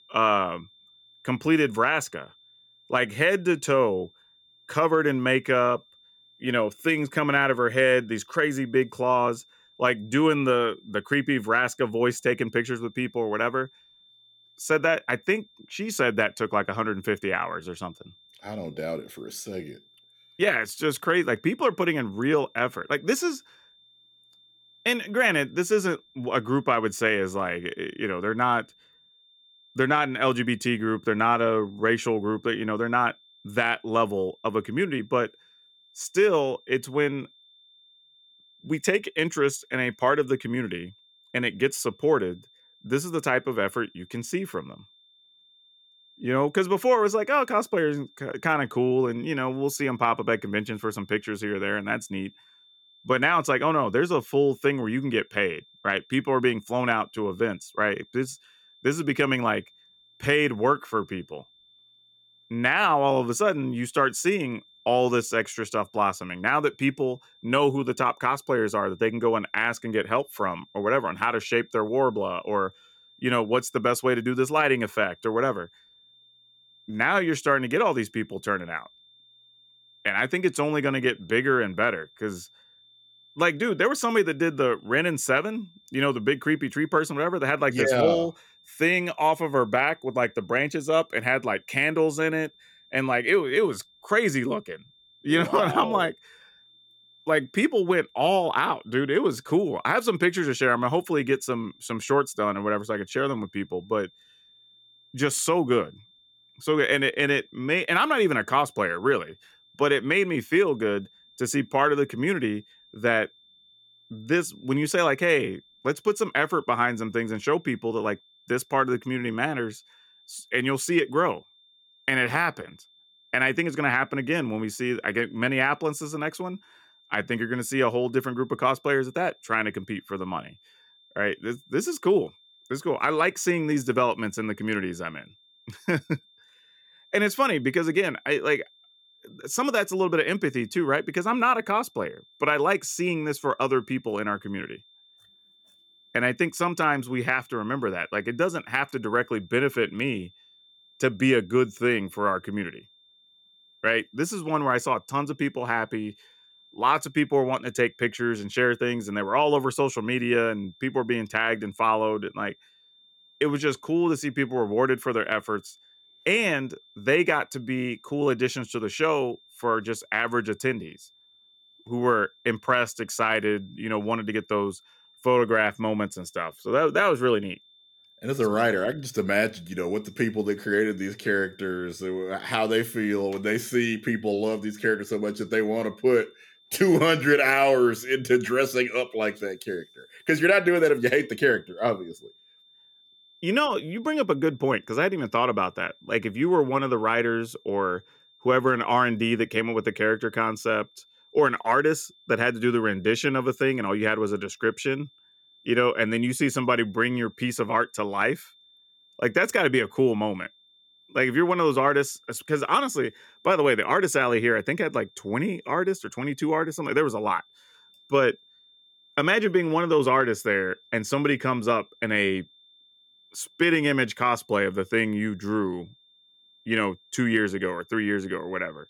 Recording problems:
high-pitched whine; faint; throughout; 3.5 kHz, 30 dB below the speech

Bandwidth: 18 kHz